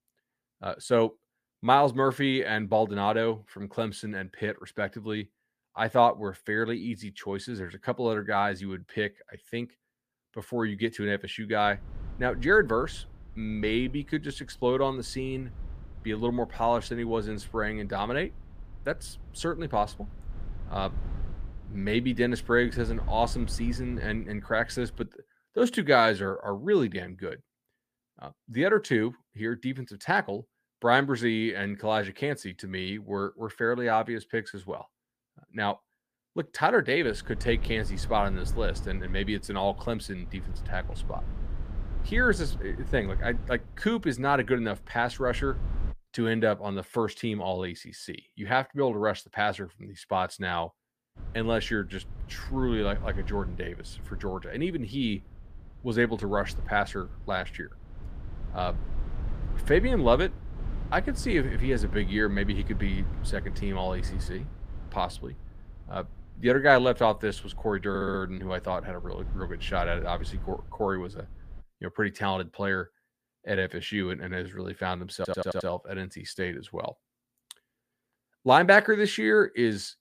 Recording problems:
low rumble; faint; from 12 to 25 s, from 37 to 46 s and from 51 s to 1:12; 25 dB below the speech
audio stuttering; at 1:08 and at 1:15

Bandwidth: 15 kHz